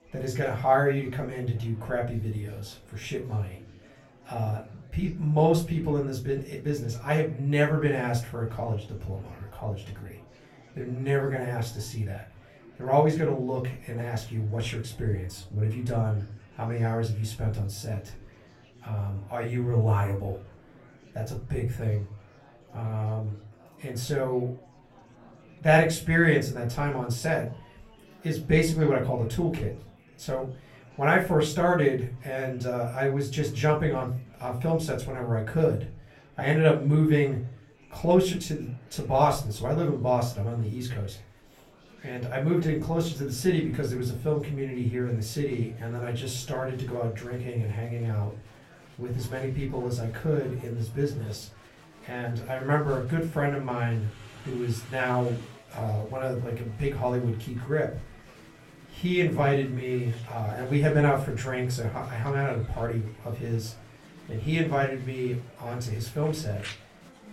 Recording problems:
off-mic speech; far
room echo; very slight; dies away in 0.3 s
murmuring crowd; faint; throughout; 25 dB below the speech

